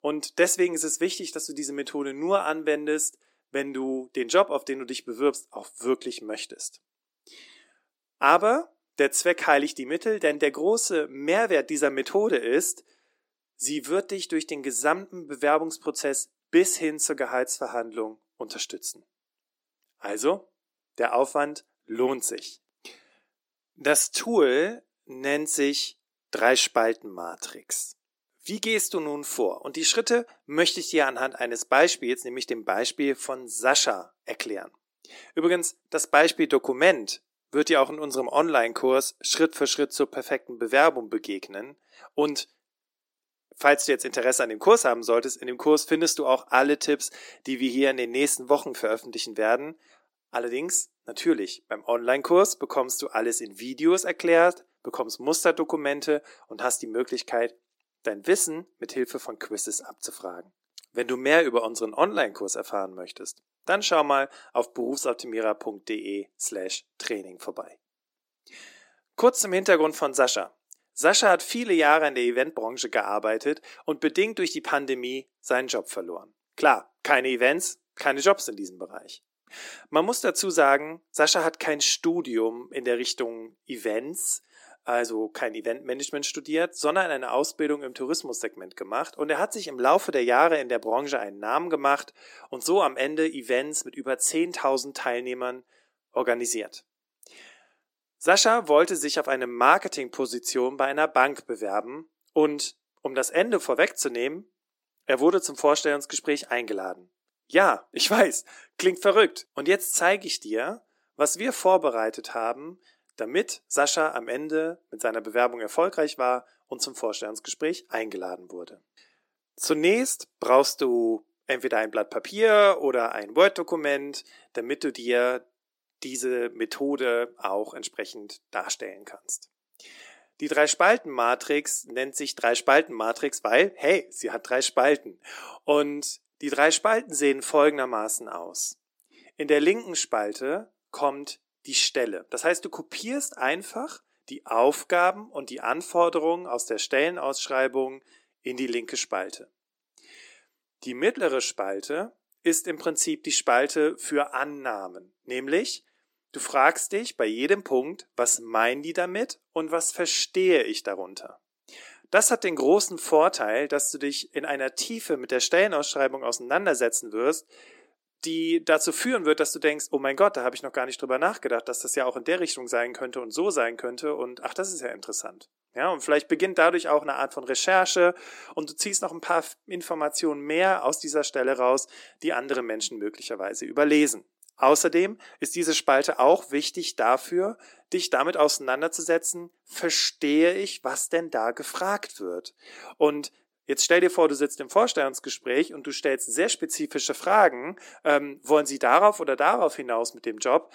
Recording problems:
thin; somewhat; fading below 300 Hz

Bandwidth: 16.5 kHz